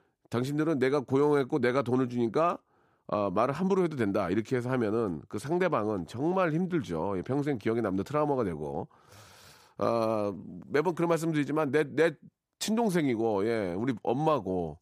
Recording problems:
none

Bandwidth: 15 kHz